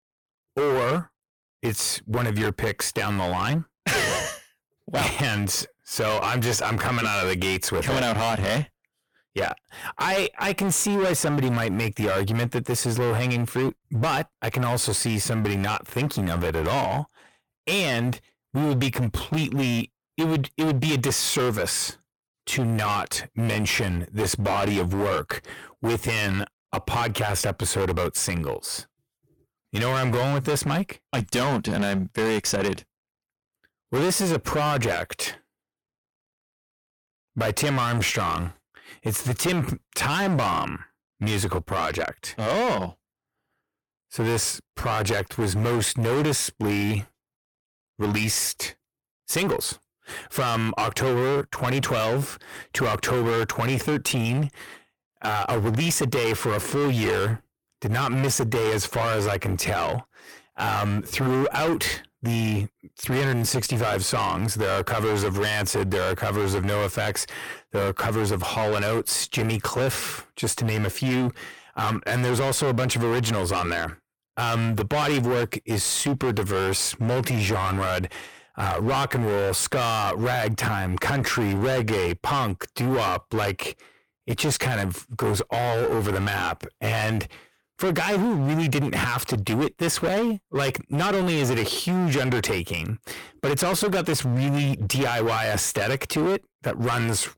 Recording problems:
distortion; heavy; 22% of the sound clipped

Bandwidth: 18.5 kHz